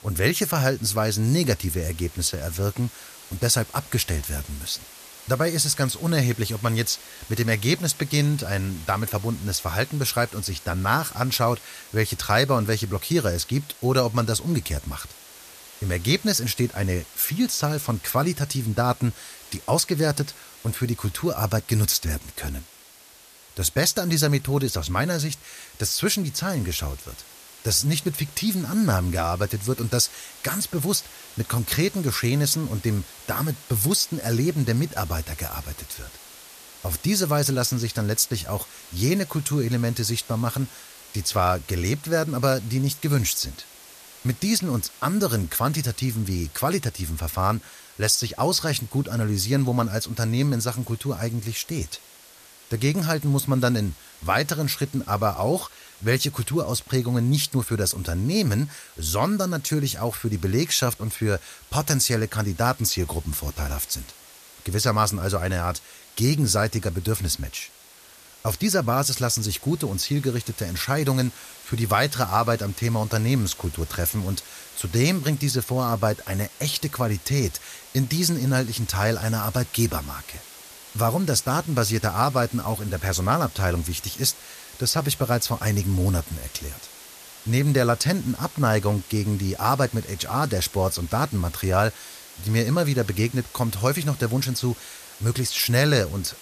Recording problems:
hiss; noticeable; throughout; 20 dB below the speech

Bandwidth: 14.5 kHz